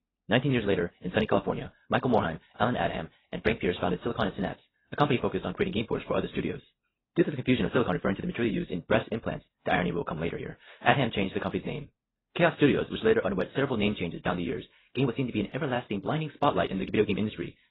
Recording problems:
garbled, watery; badly; nothing above 4 kHz
wrong speed, natural pitch; too fast; 1.5 times normal speed

